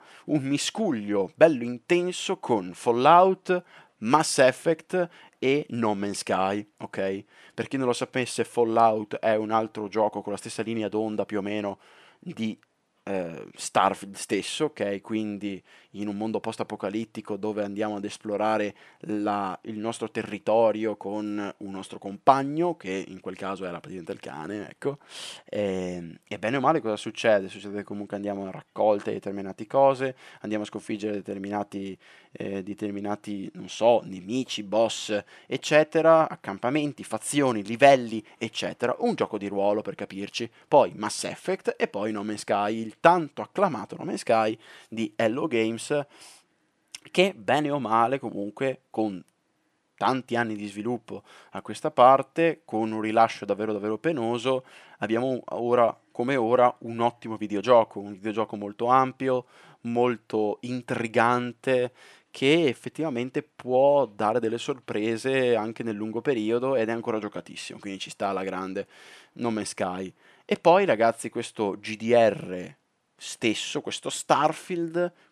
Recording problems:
none

